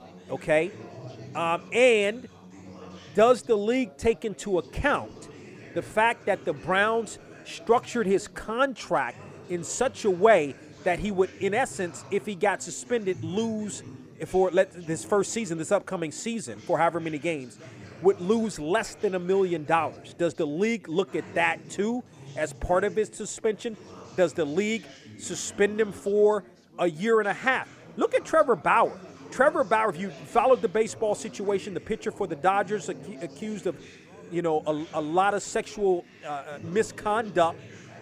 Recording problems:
background chatter; noticeable; throughout; 3 voices, 20 dB below the speech

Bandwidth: 15 kHz